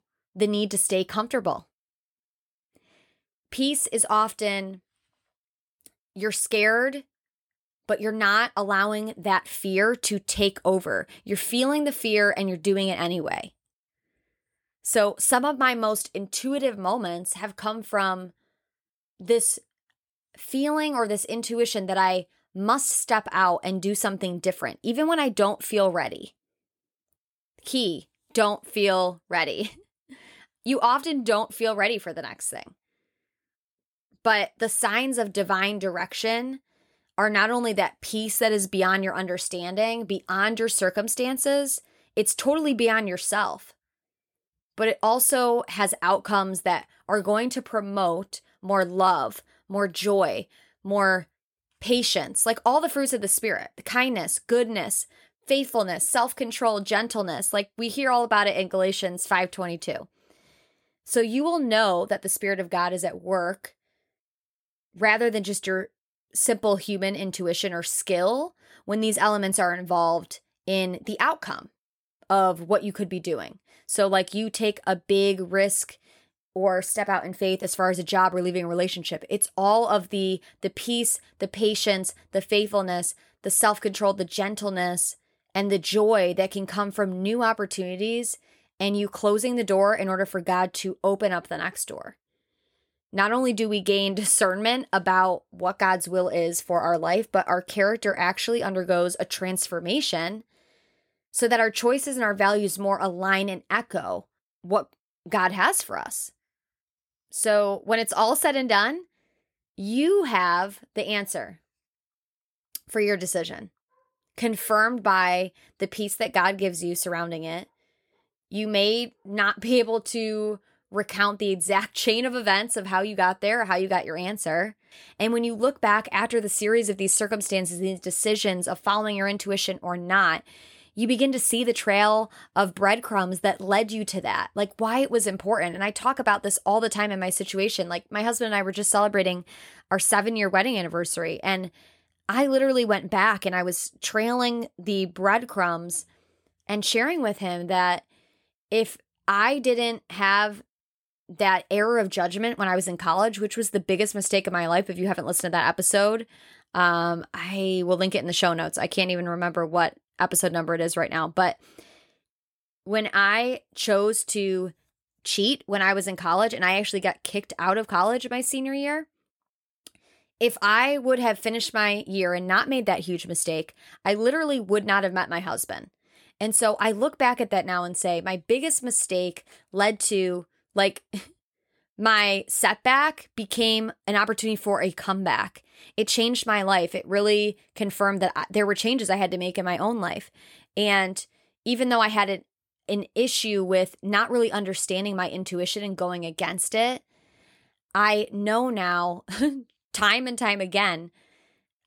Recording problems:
none

